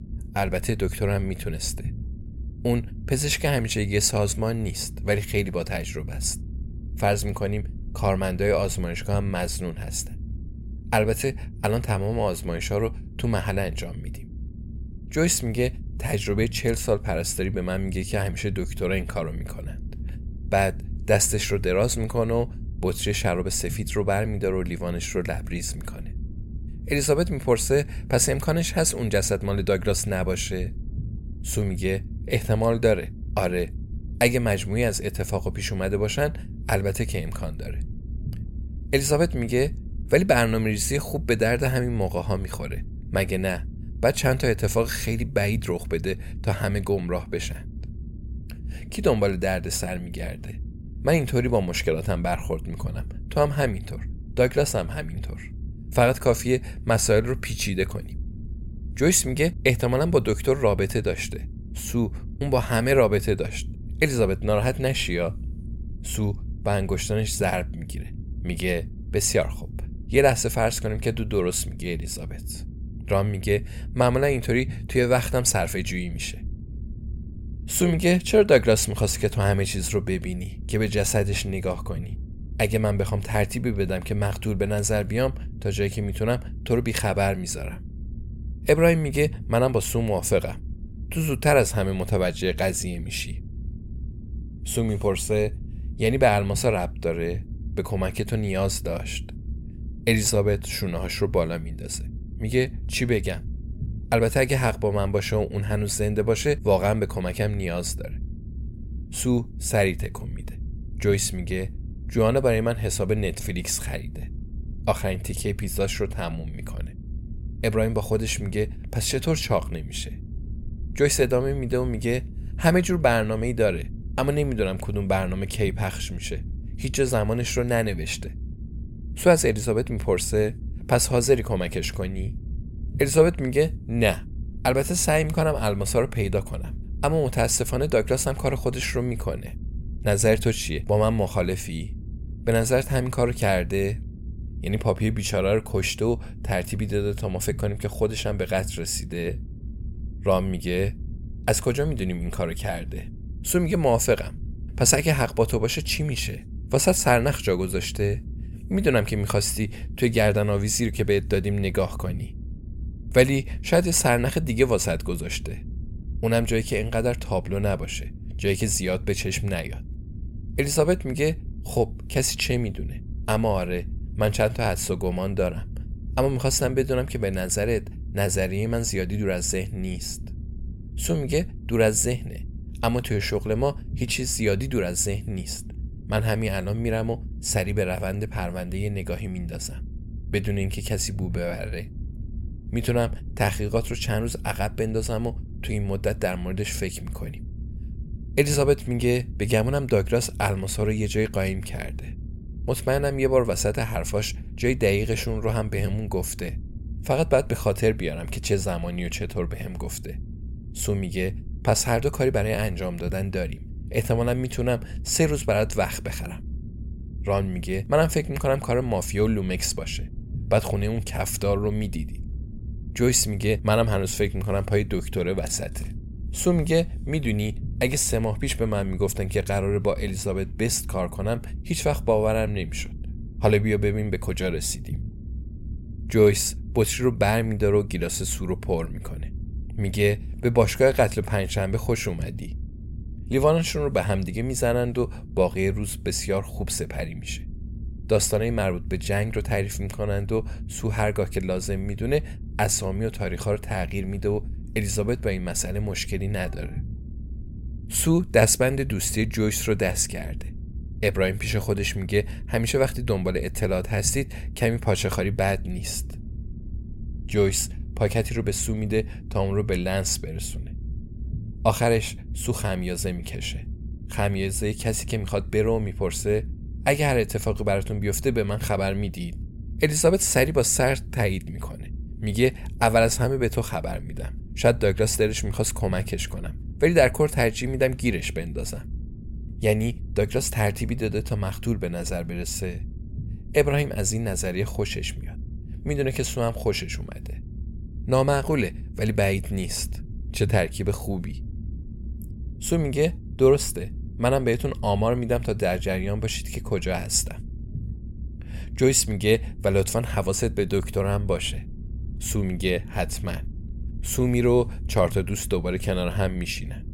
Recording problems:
low rumble; faint; throughout; 25 dB below the speech

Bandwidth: 16 kHz